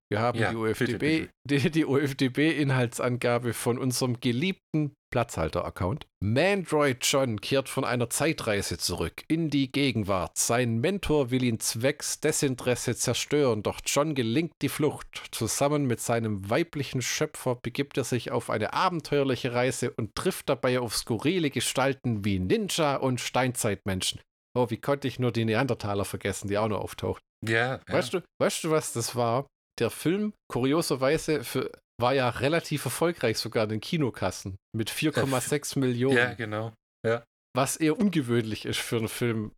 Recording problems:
none

